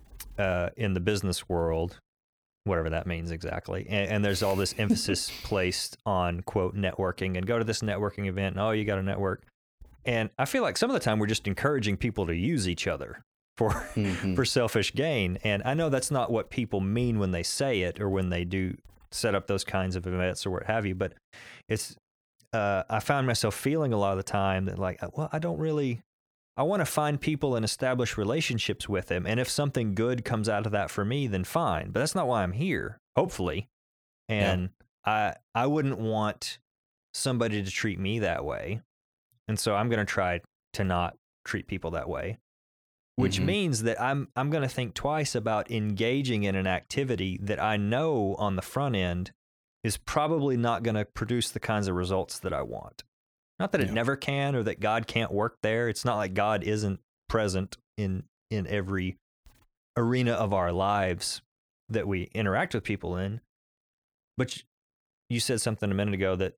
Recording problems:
none

